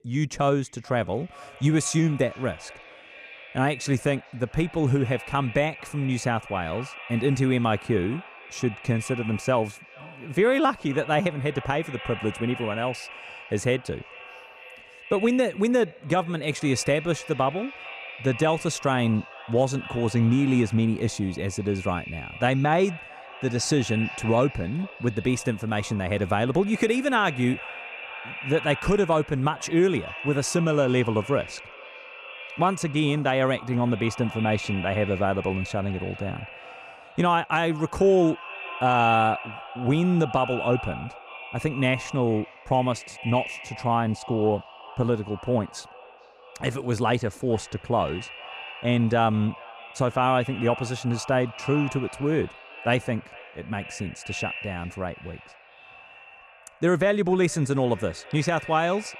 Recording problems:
echo of what is said; noticeable; throughout; 440 ms later, 15 dB below the speech

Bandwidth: 15 kHz